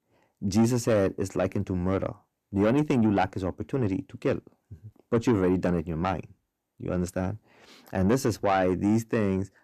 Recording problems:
distortion; slight; 10 dB below the speech

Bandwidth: 14.5 kHz